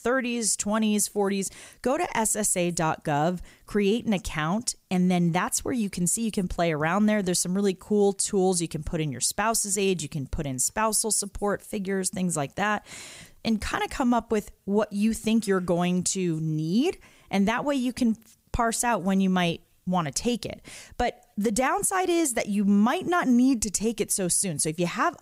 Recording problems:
none

